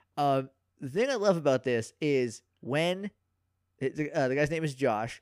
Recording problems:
none

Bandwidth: 15 kHz